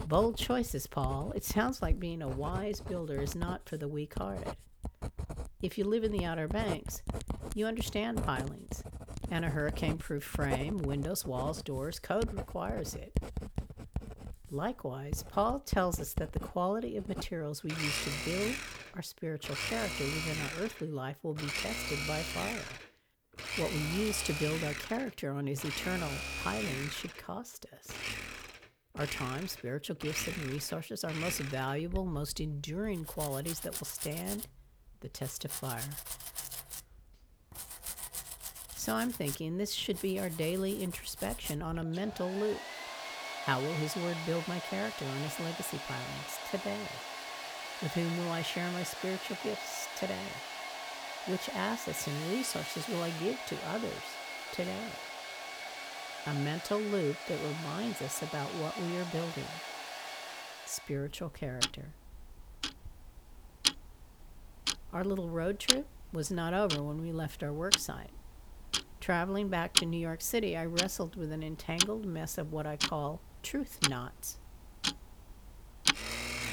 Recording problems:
household noises; loud; throughout; 2 dB below the speech

